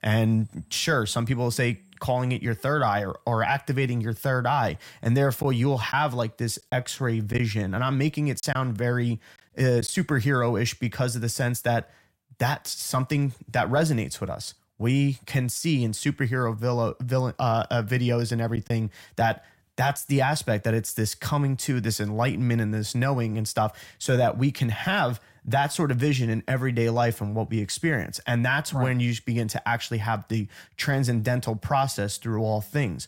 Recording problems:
choppy; occasionally; from 5.5 to 10 s and at 19 s; 4% of the speech affected

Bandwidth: 16 kHz